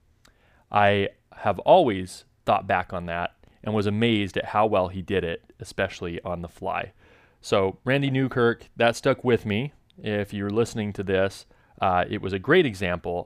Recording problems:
none

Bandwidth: 15 kHz